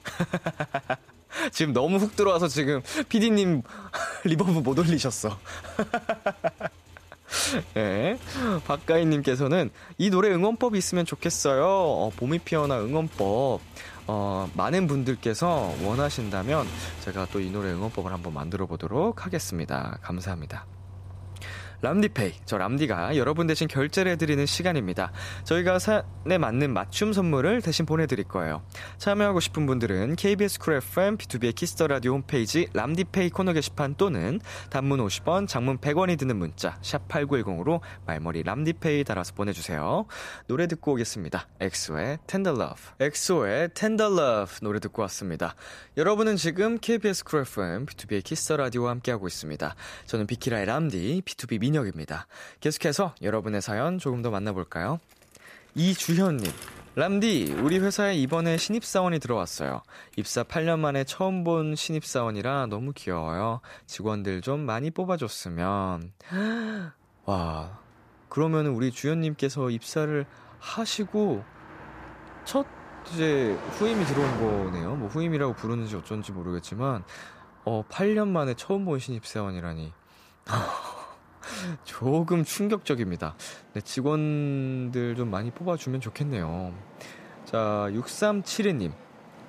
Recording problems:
traffic noise; noticeable; throughout; 15 dB below the speech

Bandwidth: 14.5 kHz